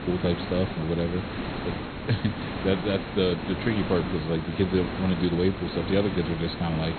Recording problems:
high frequencies cut off; severe; nothing above 4 kHz
hiss; loud; throughout; 5 dB below the speech

